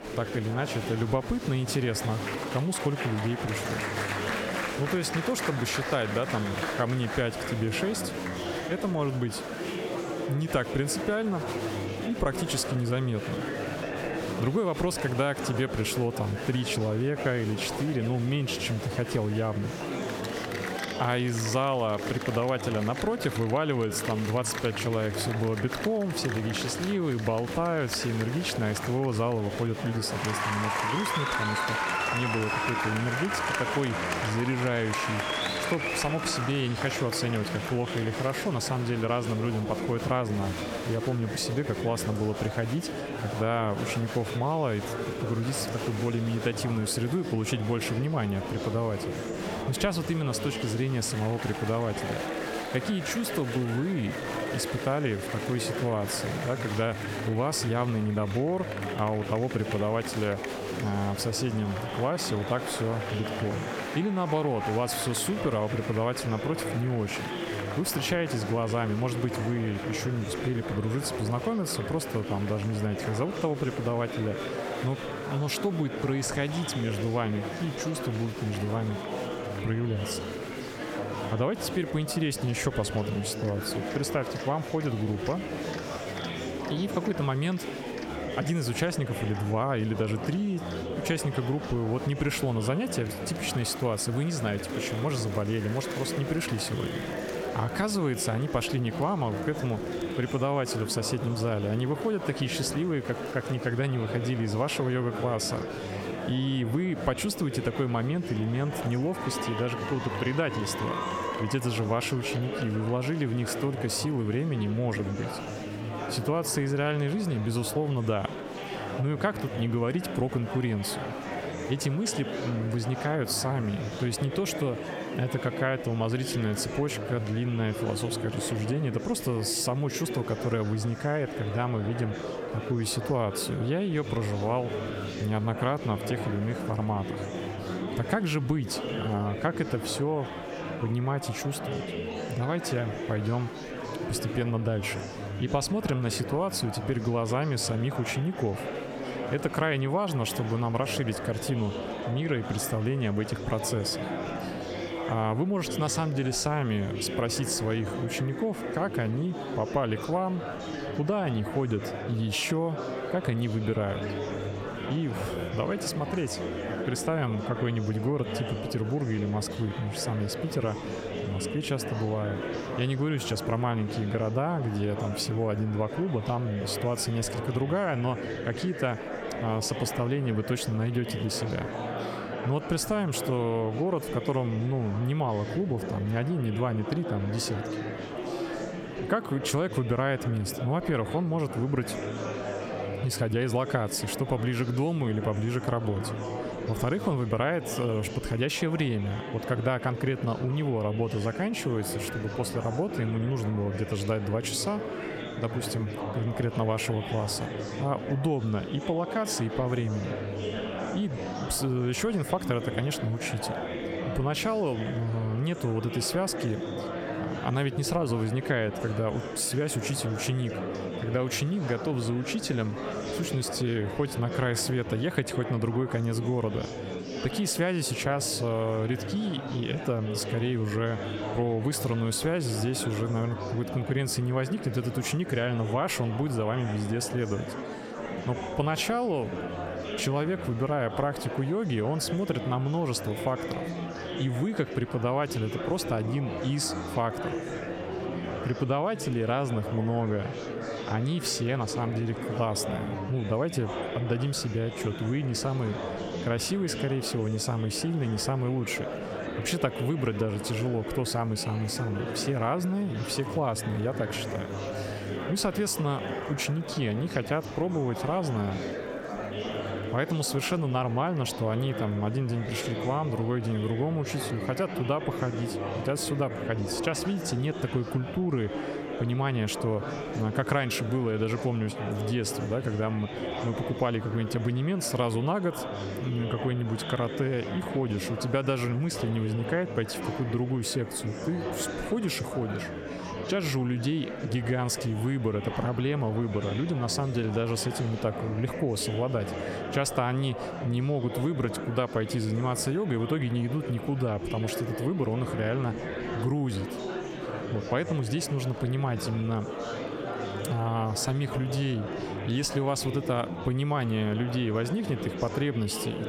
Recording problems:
squashed, flat; somewhat
murmuring crowd; loud; throughout; 6 dB below the speech

